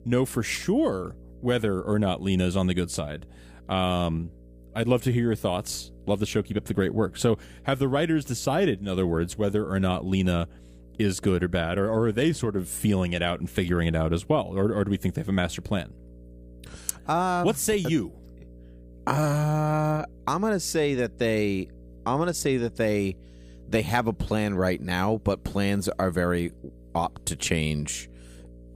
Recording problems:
electrical hum; faint; throughout; 60 Hz, 30 dB below the speech

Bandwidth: 15 kHz